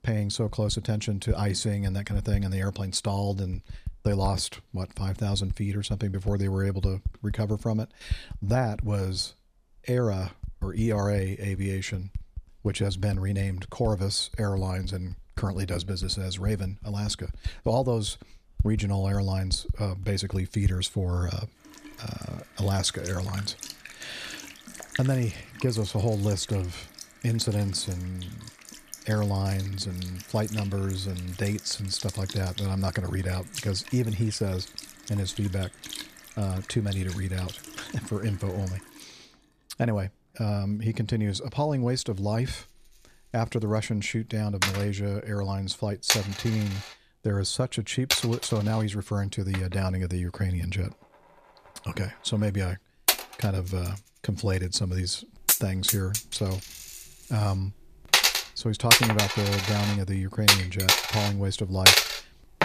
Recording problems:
household noises; very loud; throughout; 2 dB above the speech

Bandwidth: 14.5 kHz